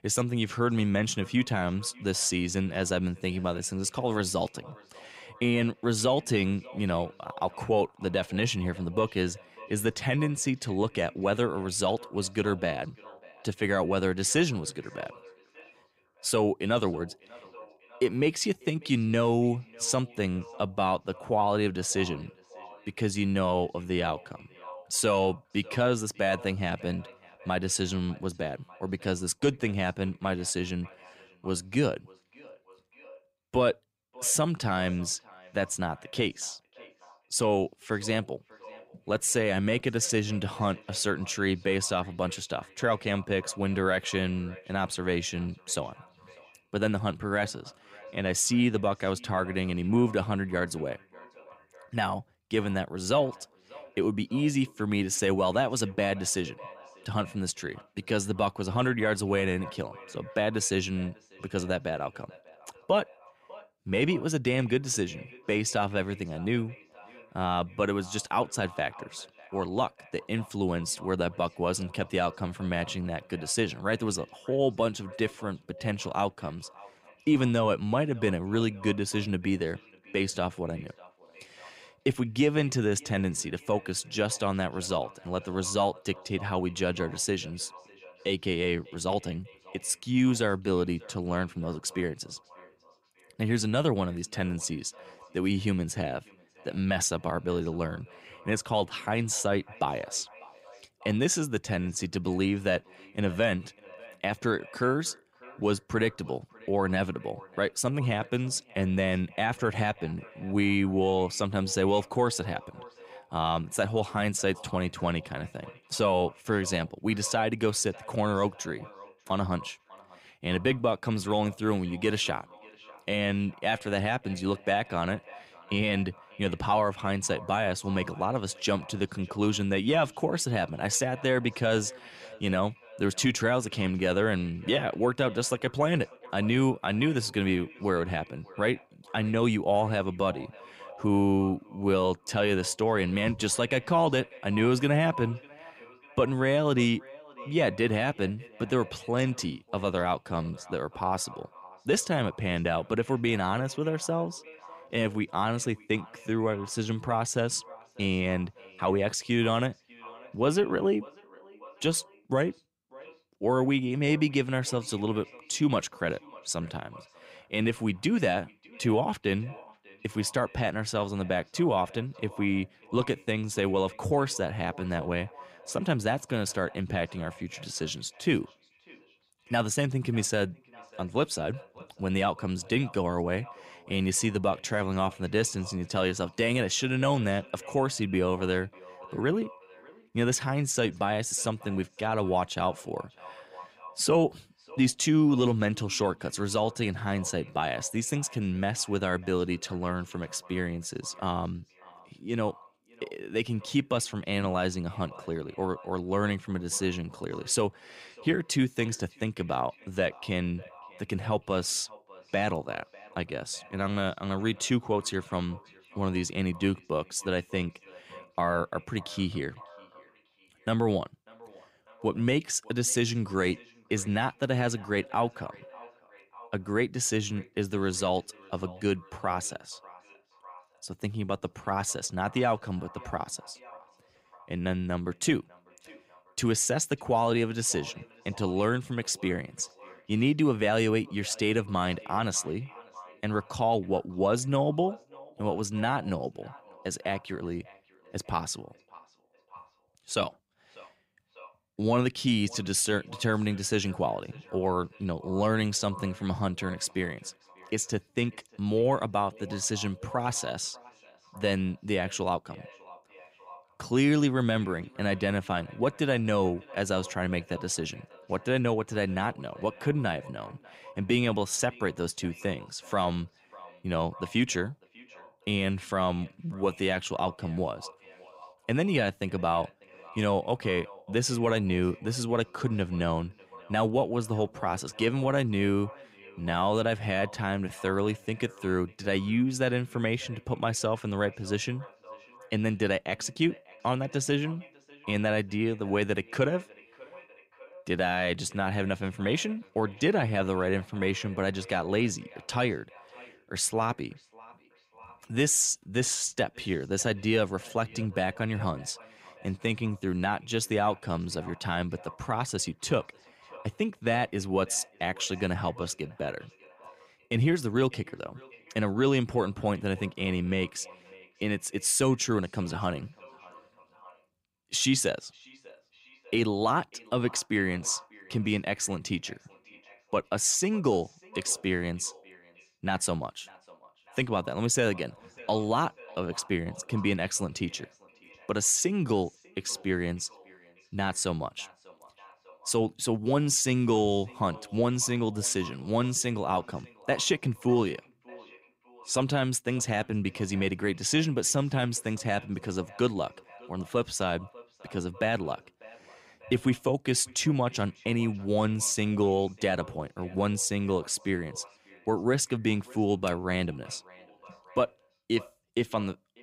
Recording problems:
echo of what is said; faint; throughout; 600 ms later, 20 dB below the speech

